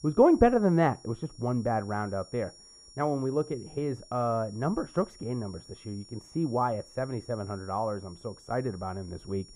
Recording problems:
muffled; very; fading above 2 kHz
high-pitched whine; faint; throughout; 5.5 kHz, 20 dB below the speech

